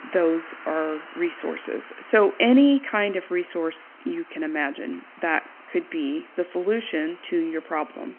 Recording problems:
phone-call audio; nothing above 3 kHz
traffic noise; noticeable; throughout; 20 dB below the speech

